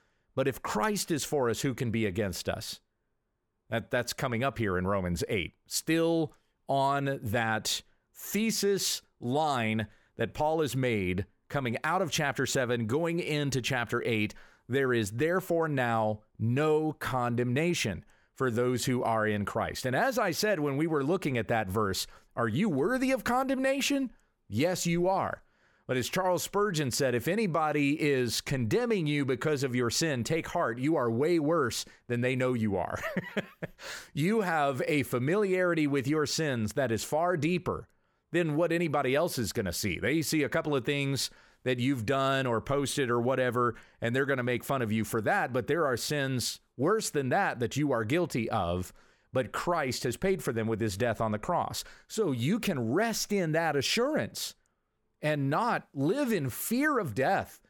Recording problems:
none

